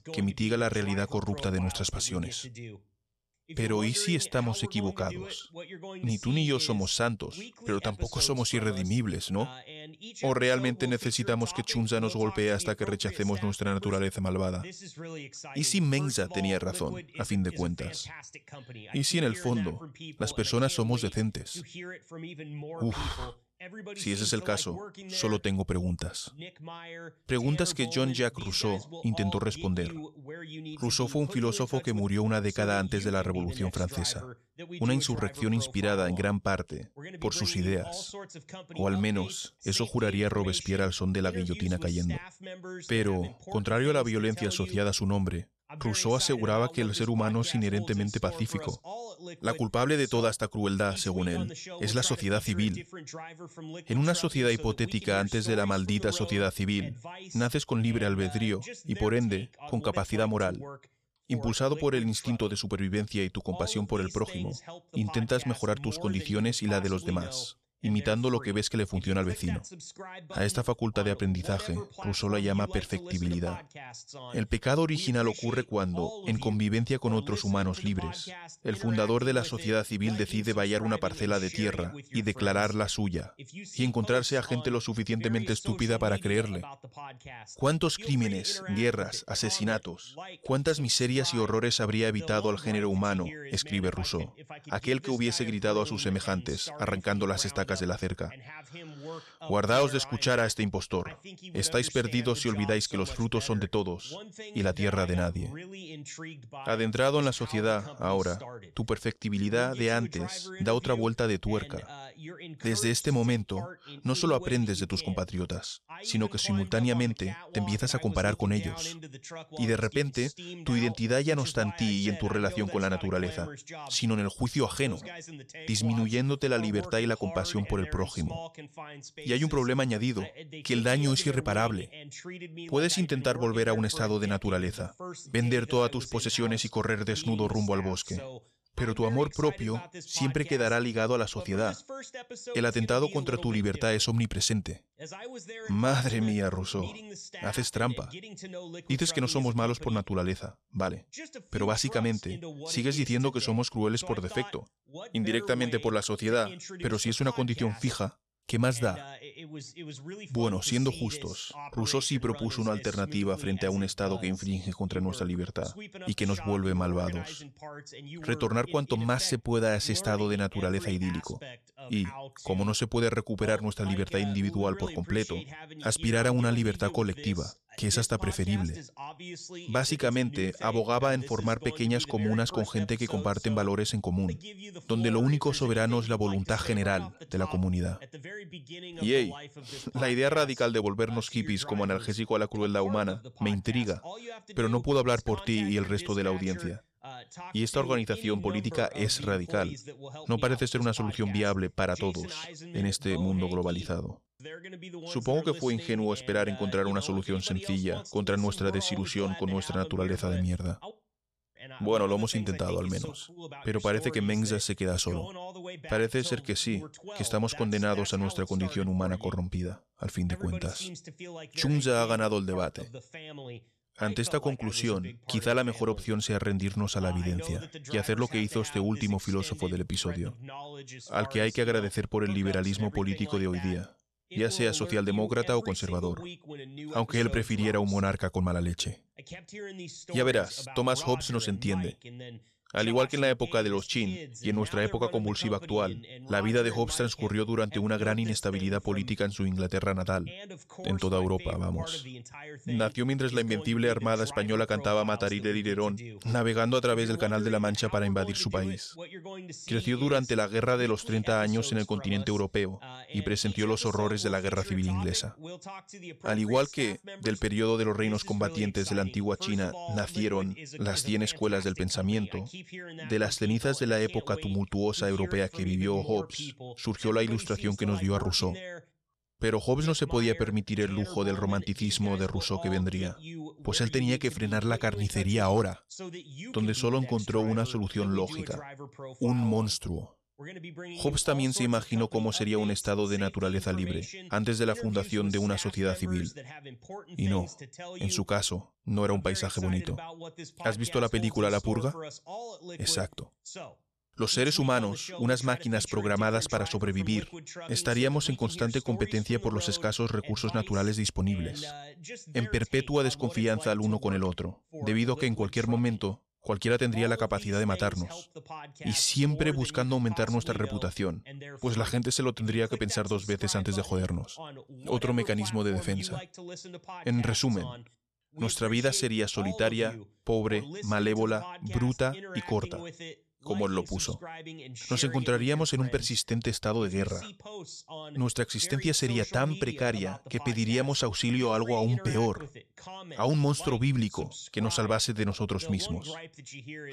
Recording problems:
voice in the background; noticeable; throughout; 15 dB below the speech

